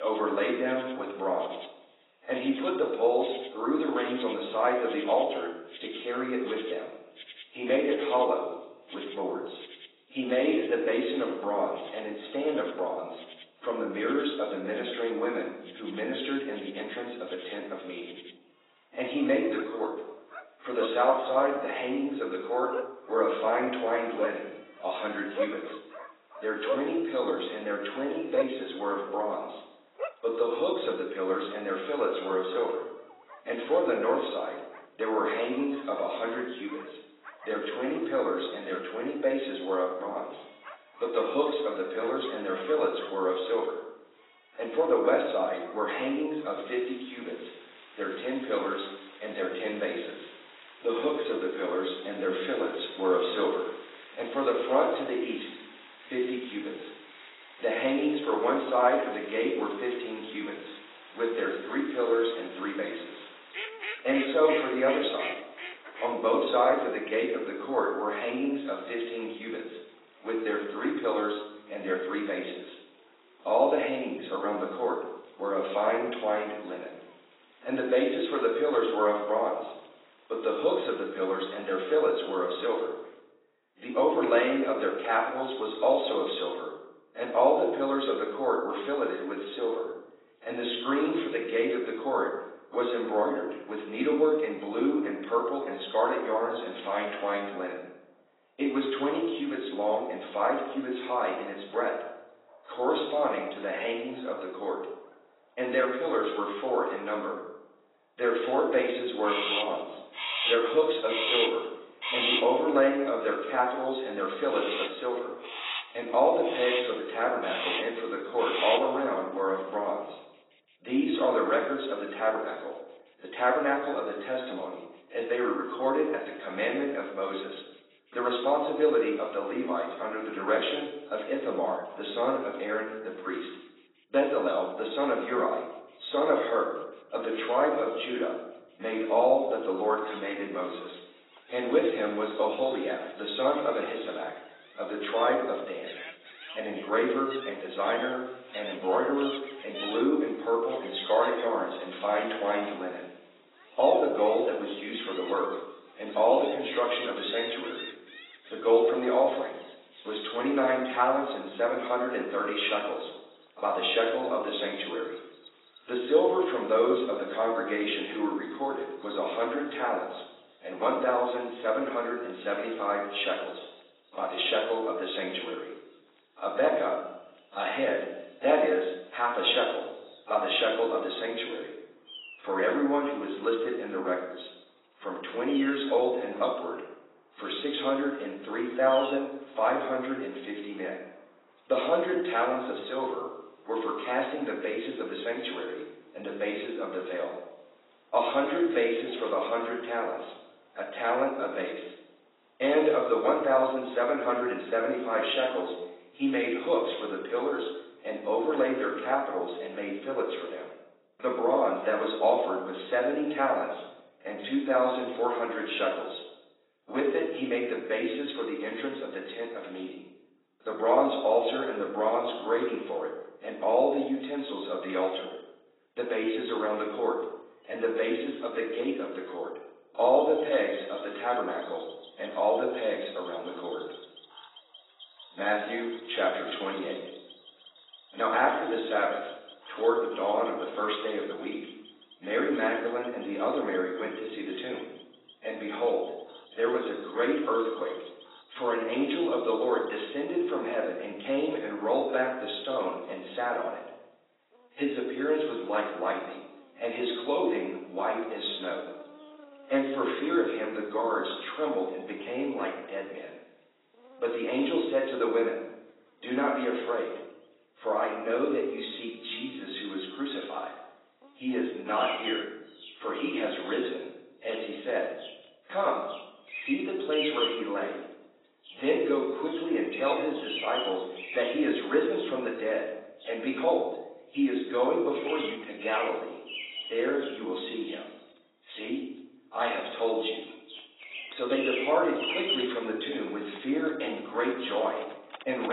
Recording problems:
off-mic speech; far
garbled, watery; badly; nothing above 4 kHz
room echo; noticeable; dies away in 0.7 s
thin; somewhat; fading below 300 Hz
animal sounds; noticeable; throughout; 10 dB below the speech
abrupt cut into speech; at the start and the end

